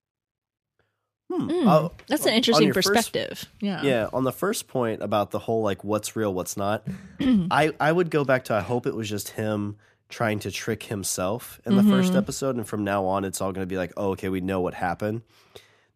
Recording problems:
none

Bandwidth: 14.5 kHz